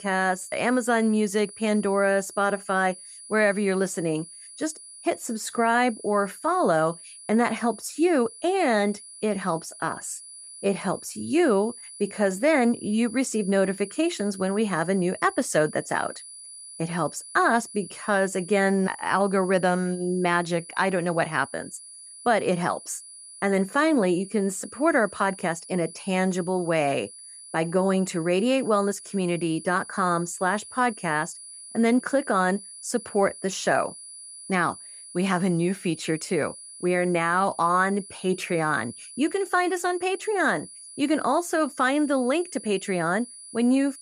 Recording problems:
high-pitched whine; noticeable; throughout; 10 kHz, 15 dB below the speech

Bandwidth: 15.5 kHz